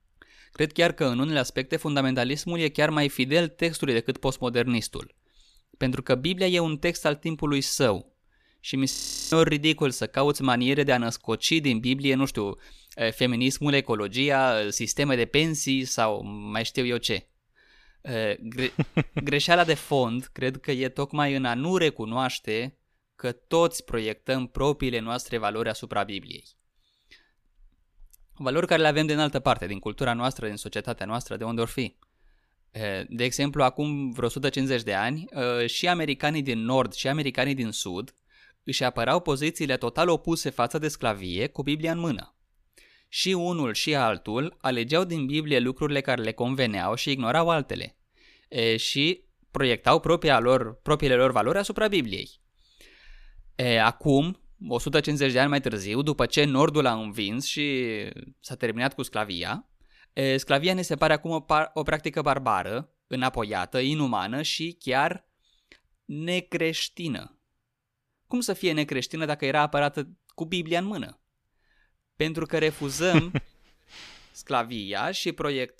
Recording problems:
audio freezing; at 9 s

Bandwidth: 14.5 kHz